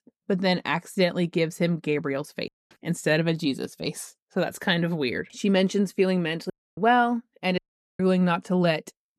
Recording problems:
audio cutting out; at 2.5 s, at 6.5 s and at 7.5 s

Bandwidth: 13.5 kHz